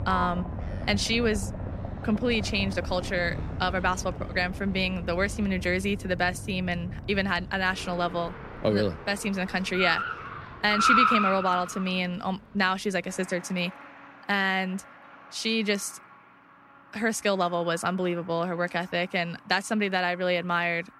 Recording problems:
traffic noise; loud; throughout; 4 dB below the speech

